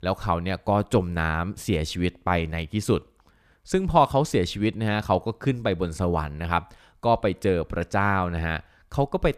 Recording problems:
none

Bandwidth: 14.5 kHz